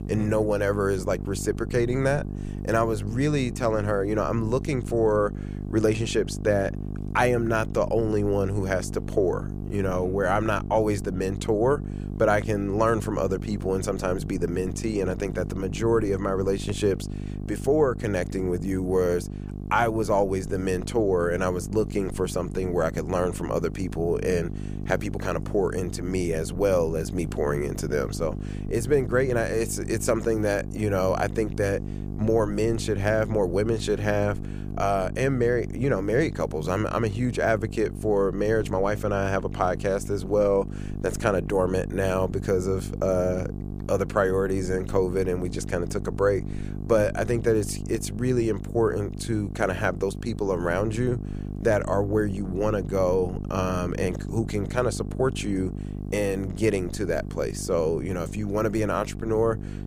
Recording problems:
electrical hum; noticeable; throughout; 50 Hz, 15 dB below the speech

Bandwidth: 15 kHz